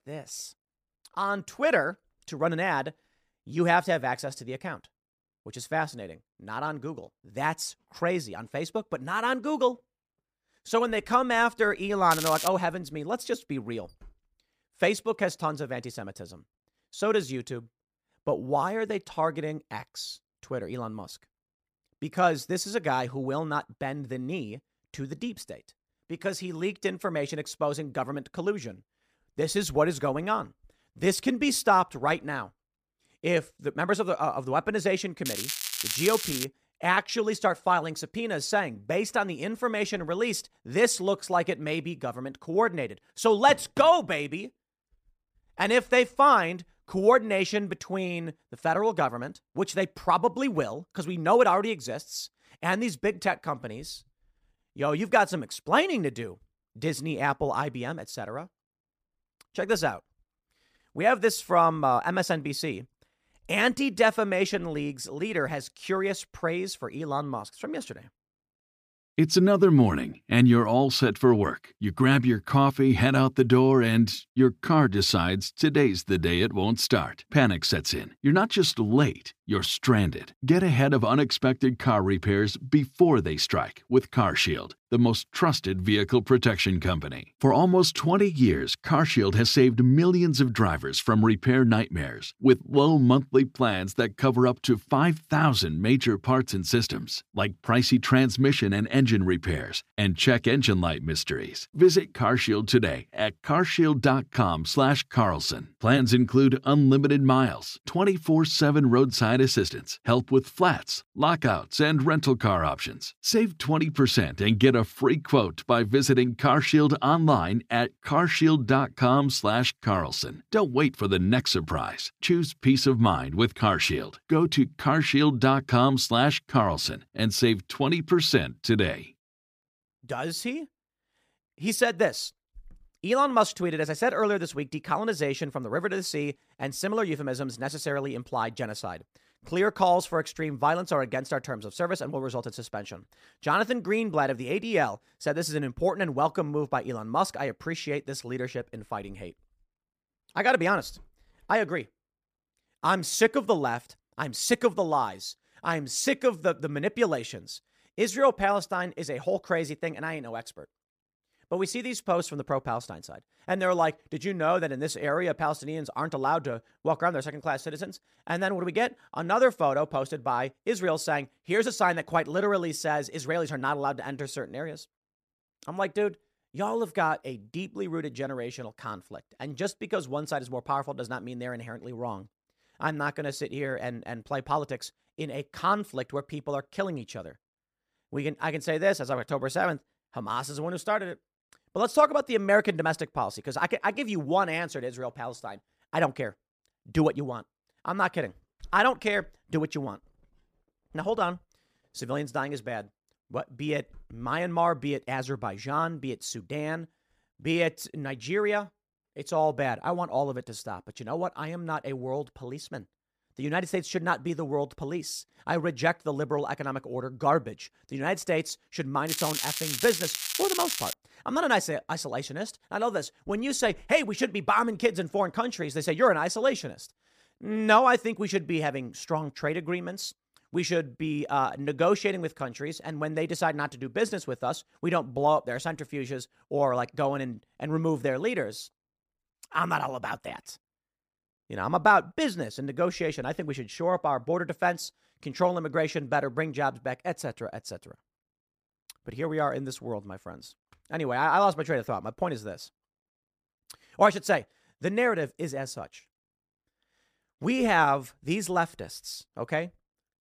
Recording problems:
crackling; loud; at 12 s, from 35 to 36 s and from 3:39 to 3:41; 5 dB below the speech

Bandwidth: 15 kHz